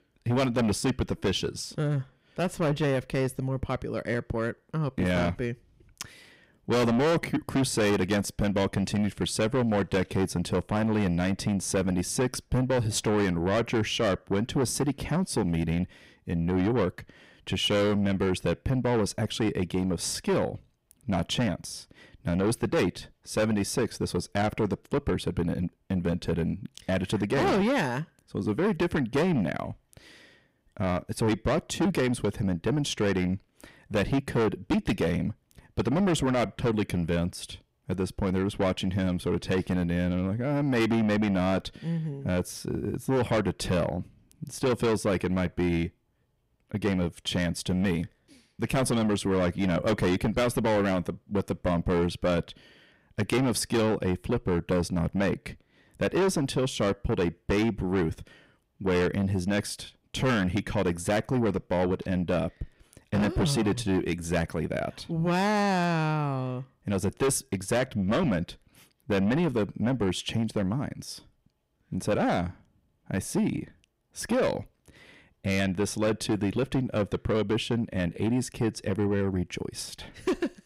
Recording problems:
distortion; heavy; 7 dB below the speech

